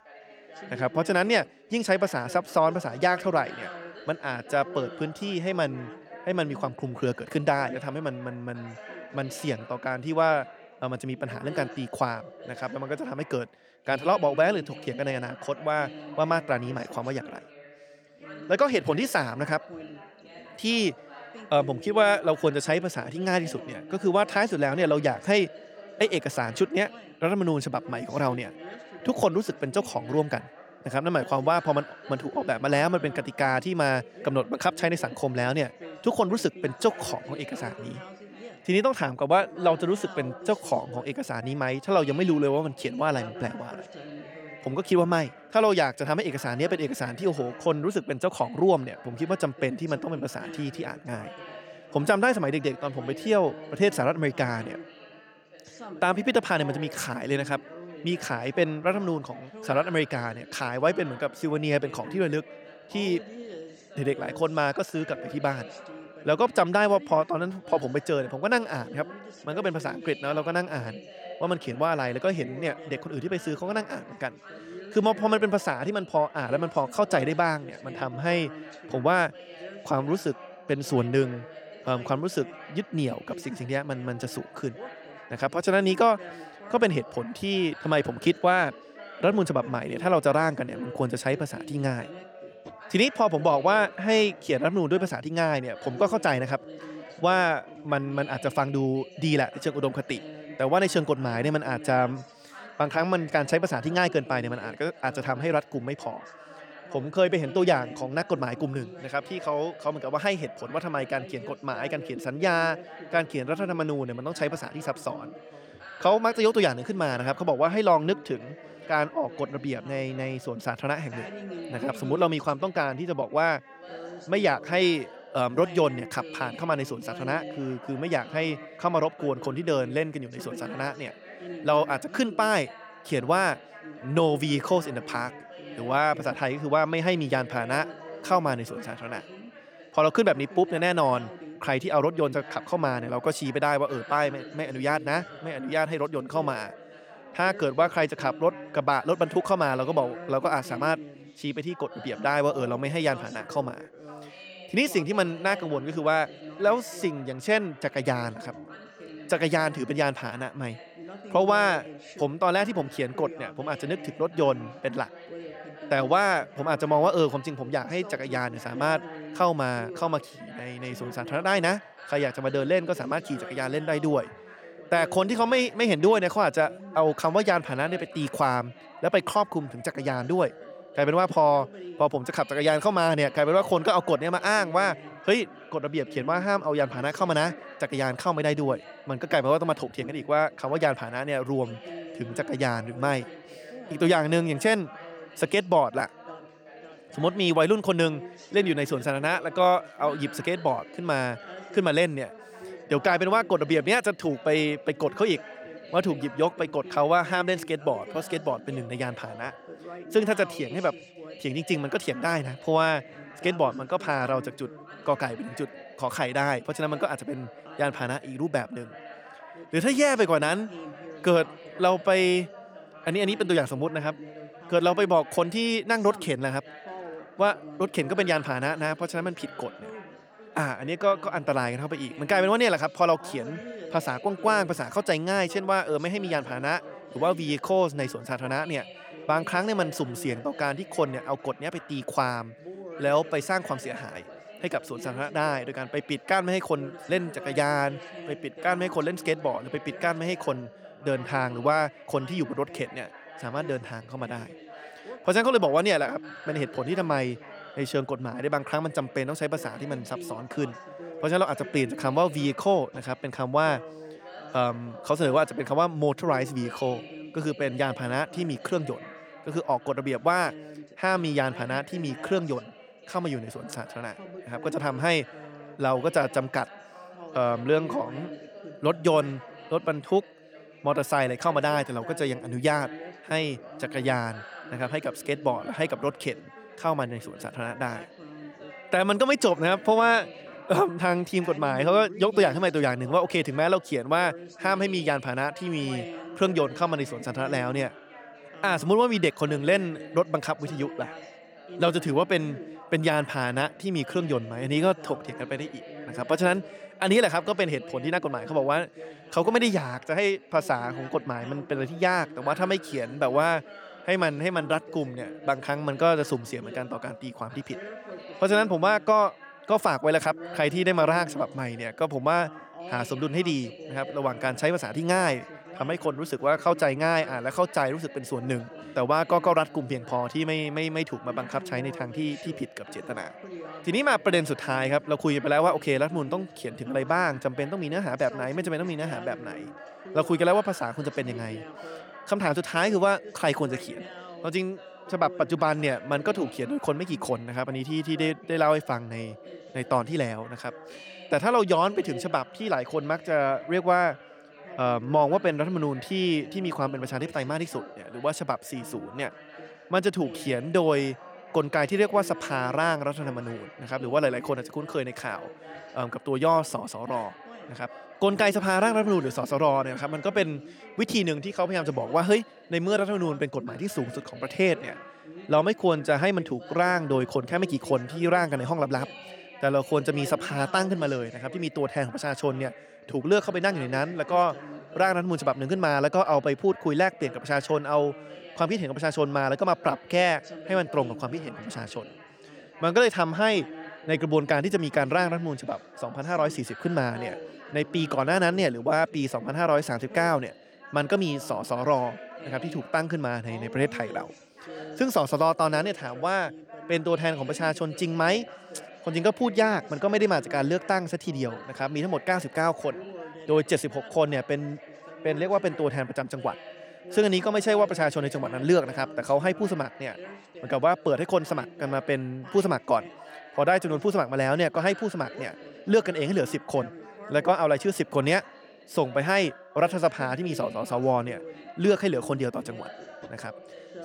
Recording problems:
background chatter; noticeable; throughout; 3 voices, 15 dB below the speech

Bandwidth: 18.5 kHz